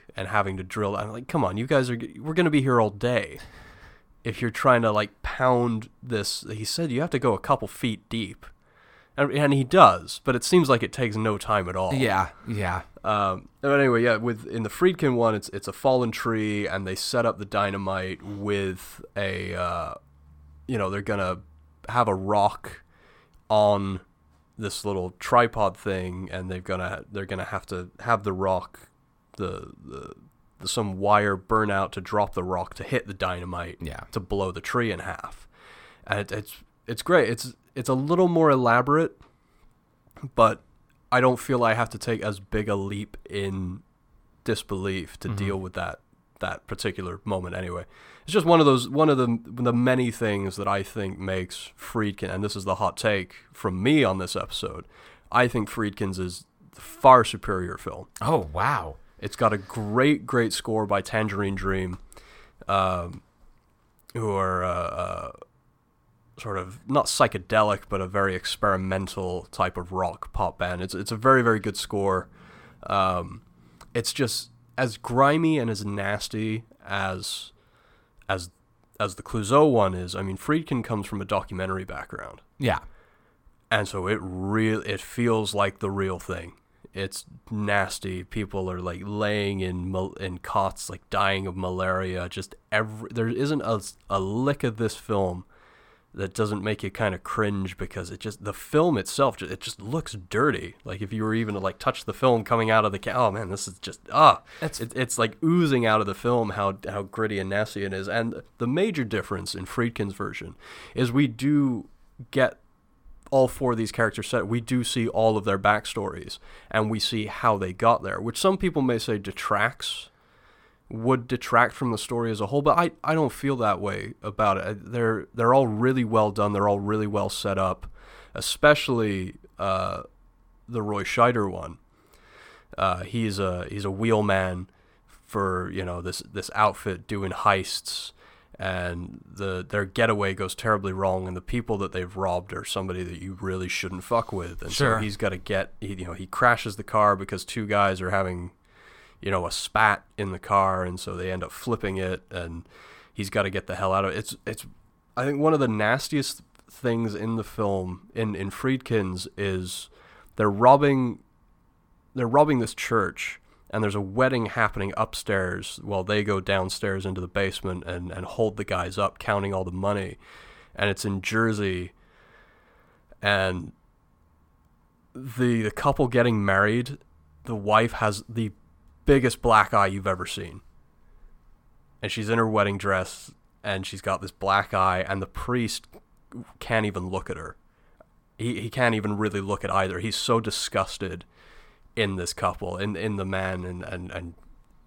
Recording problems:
none

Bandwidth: 17 kHz